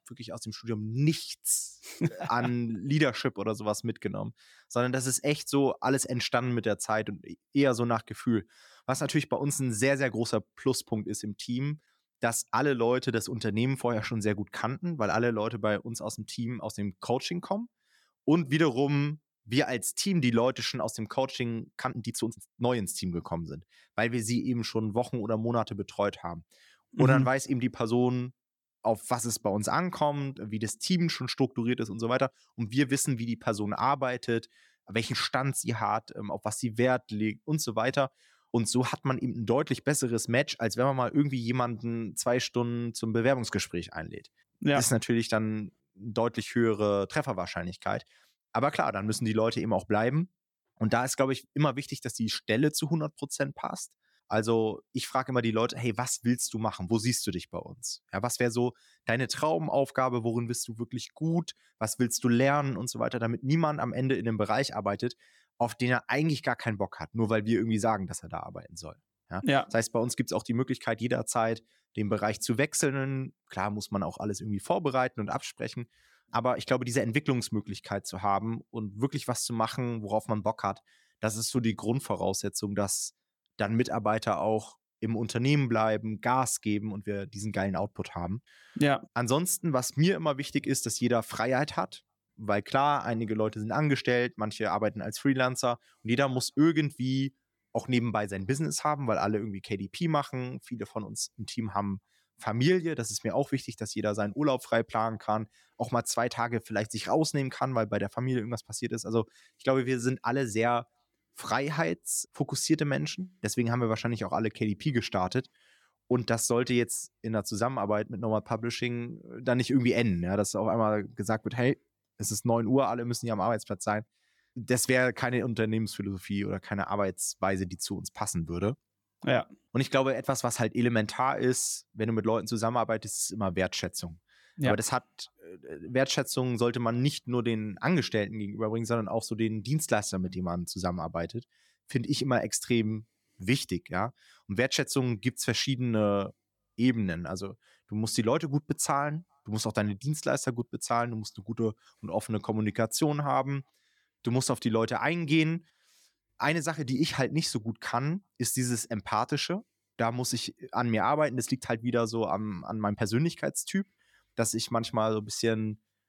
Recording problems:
uneven, jittery; strongly; from 22 s to 2:43

